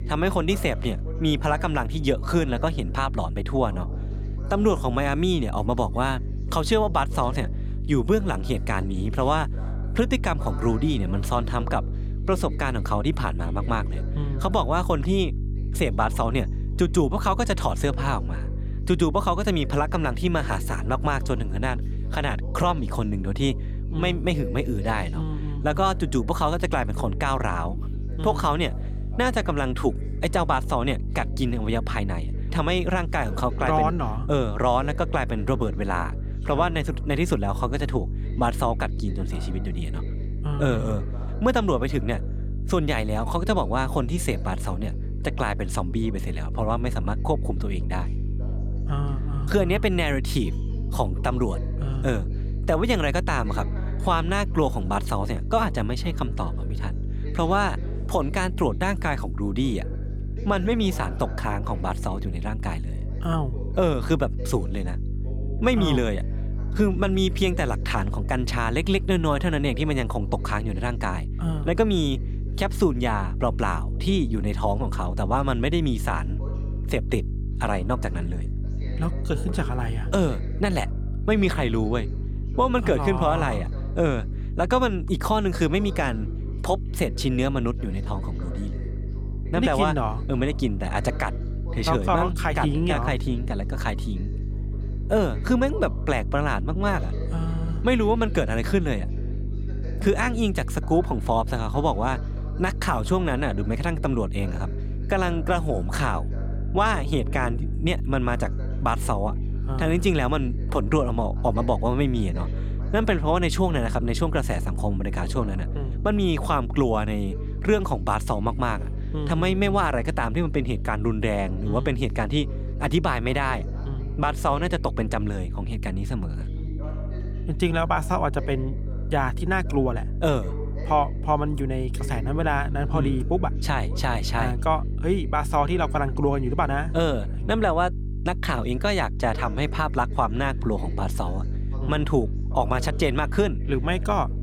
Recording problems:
electrical hum; noticeable; throughout; 50 Hz, 20 dB below the speech
voice in the background; noticeable; throughout; 20 dB below the speech

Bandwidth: 18 kHz